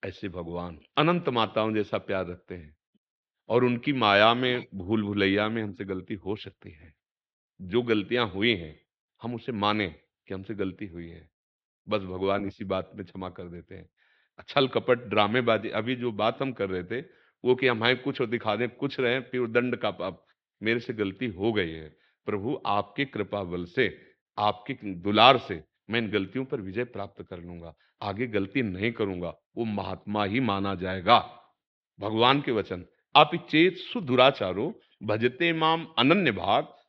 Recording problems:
muffled; slightly; fading above 4 kHz

